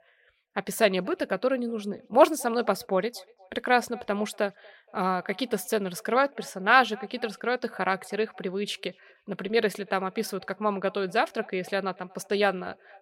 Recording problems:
echo of what is said; faint; throughout; 240 ms later, 25 dB below the speech

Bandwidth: 16 kHz